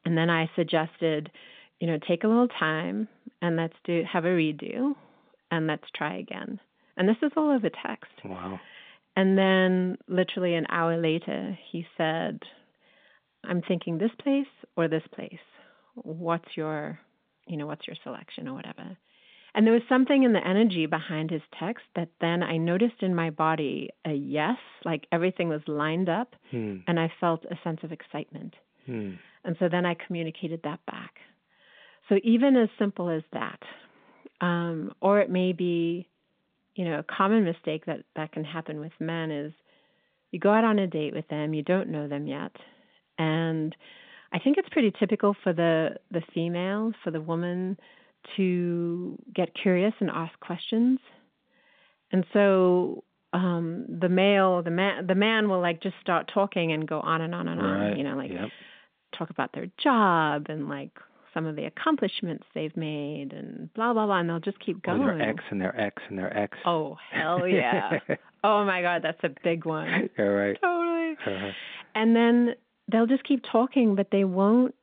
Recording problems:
phone-call audio

